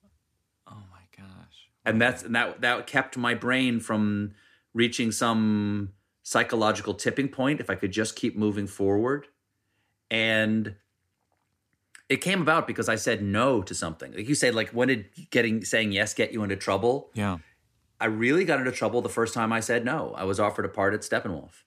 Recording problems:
none

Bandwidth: 14.5 kHz